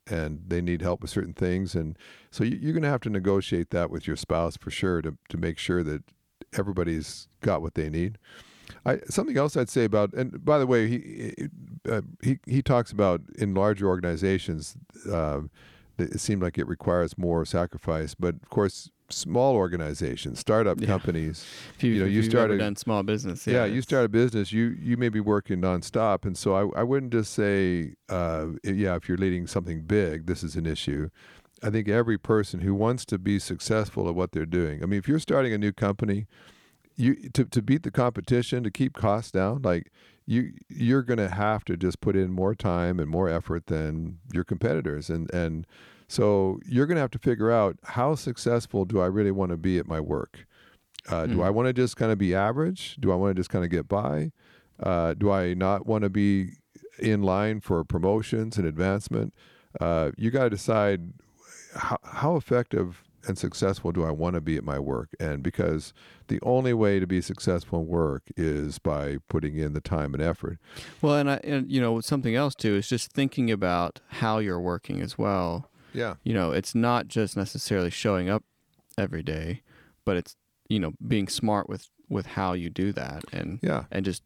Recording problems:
none

